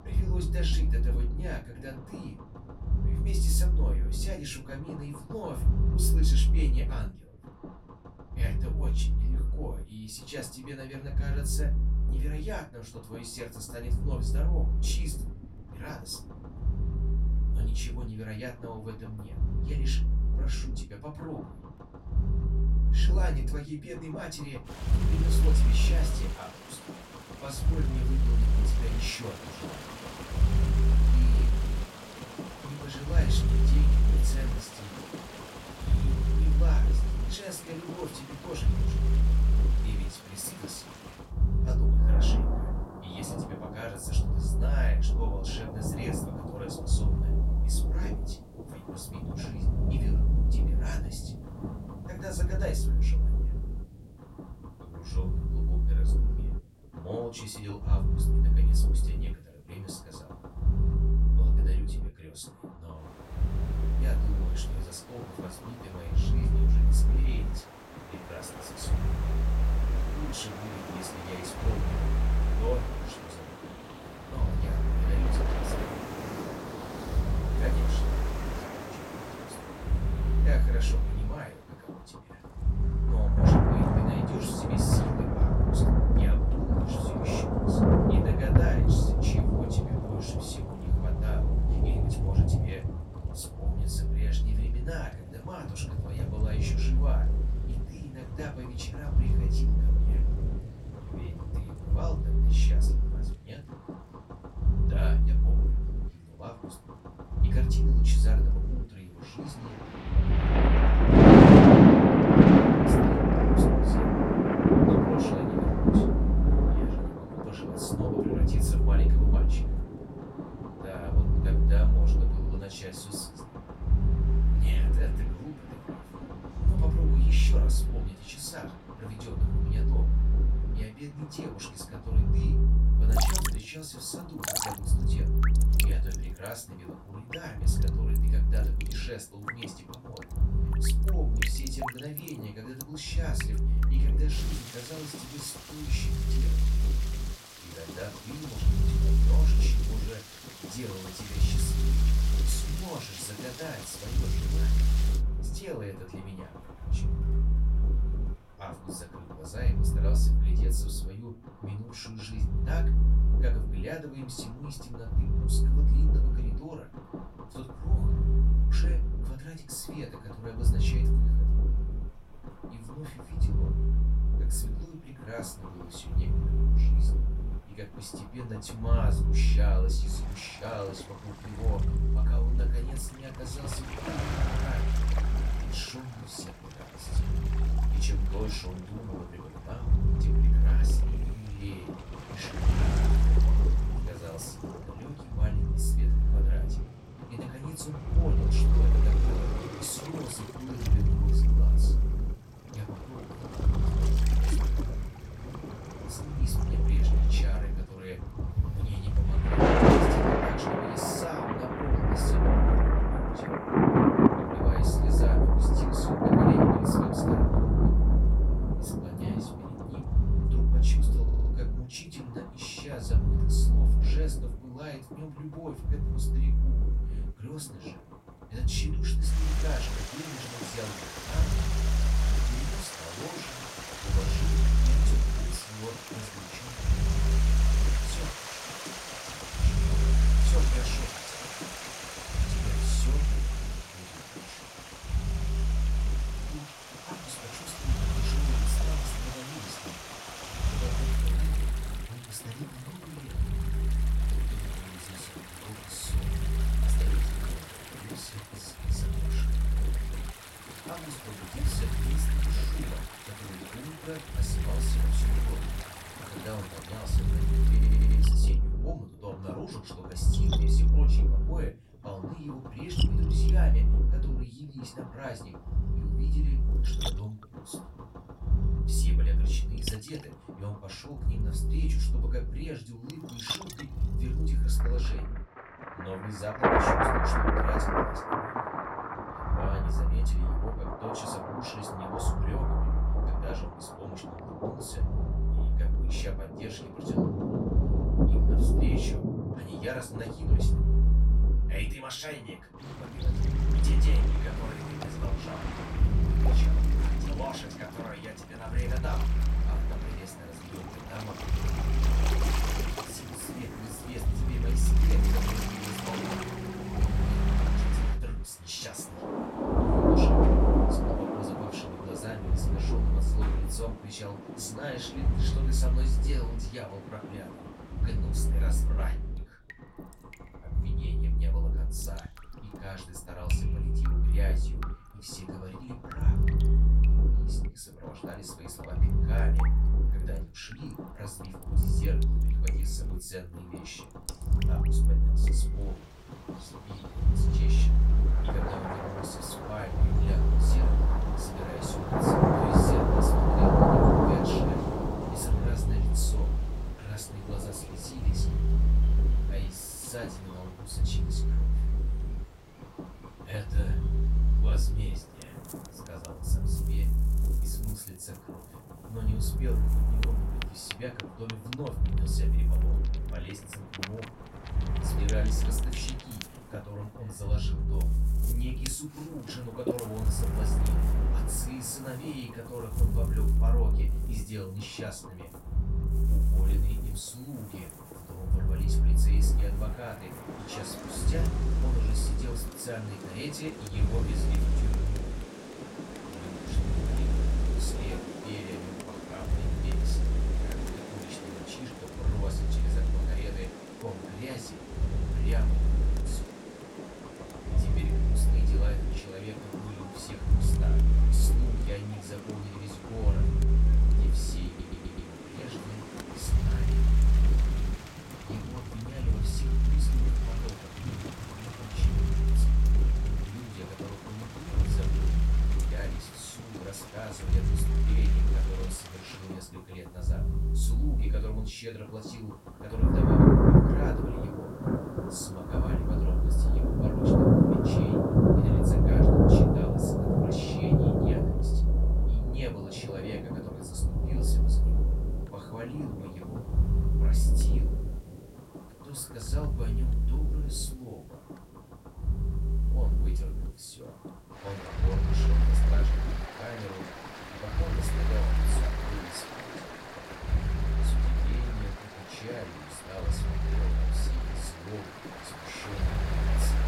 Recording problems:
off-mic speech; far
room echo; very slight; dies away in 0.2 s
rain or running water; very loud; throughout; 10 dB above the speech
low rumble; loud; throughout; 3 dB below the speech
audio stuttering; at 3:41, at 4:28 and at 6:55

